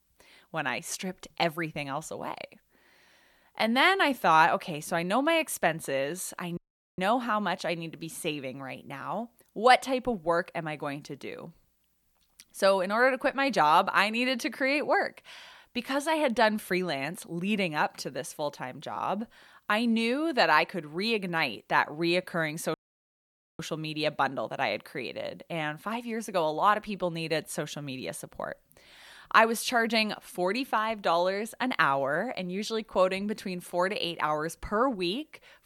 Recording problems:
audio cutting out; at 6.5 s and at 23 s for 1 s

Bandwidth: 18 kHz